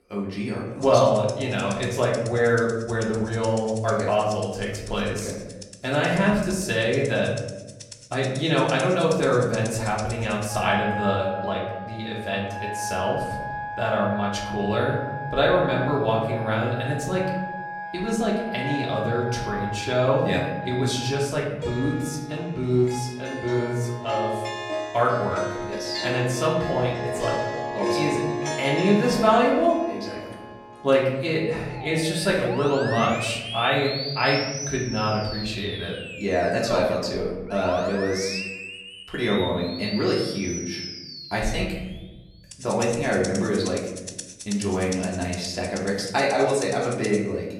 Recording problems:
off-mic speech; far
room echo; noticeable; dies away in 1 s
background music; loud; throughout; 9 dB below the speech

